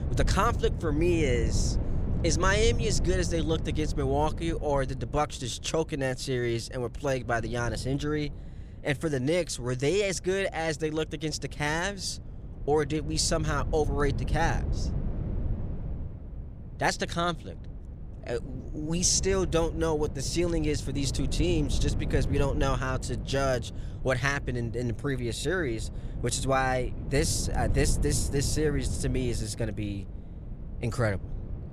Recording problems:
wind noise on the microphone; occasional gusts; 15 dB below the speech

